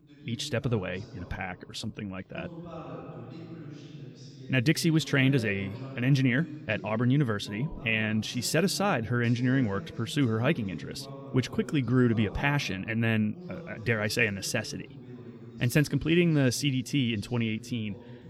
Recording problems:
voice in the background; noticeable; throughout; 15 dB below the speech

